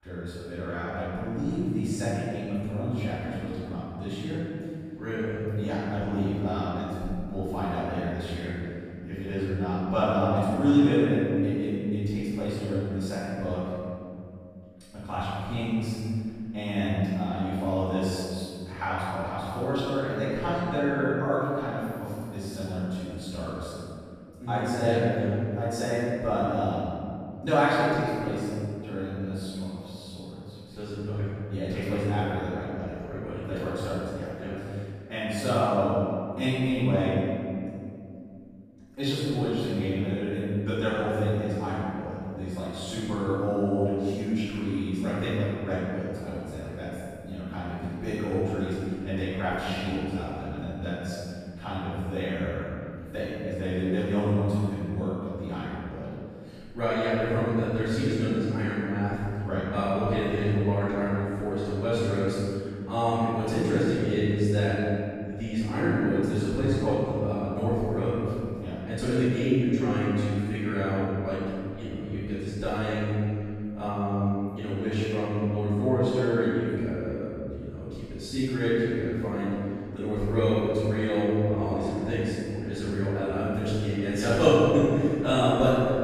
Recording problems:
room echo; strong; dies away in 2.4 s
off-mic speech; far

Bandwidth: 15 kHz